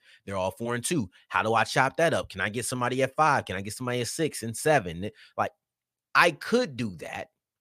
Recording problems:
none

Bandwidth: 15 kHz